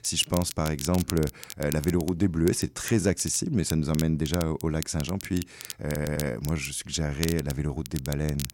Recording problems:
crackle, like an old record; noticeable; 10 dB below the speech
audio stuttering; at 6 s

